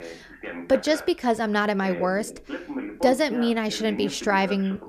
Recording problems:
voice in the background; noticeable; throughout; 10 dB below the speech

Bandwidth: 14.5 kHz